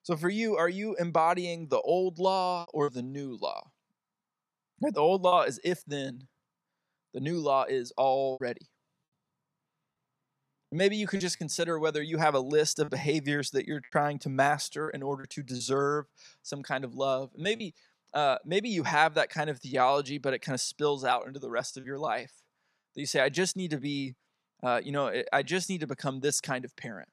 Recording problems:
choppy; occasionally; 3% of the speech affected

